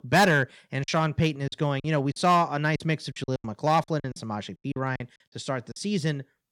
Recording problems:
distortion; slight; 2% of the sound clipped
choppy; very; 11% of the speech affected

